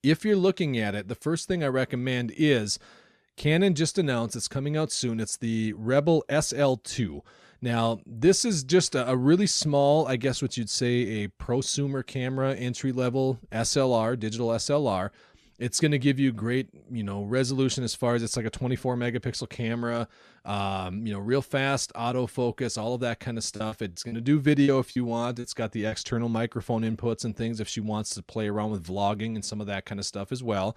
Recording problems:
choppy; very; from 24 to 26 s; 10% of the speech affected

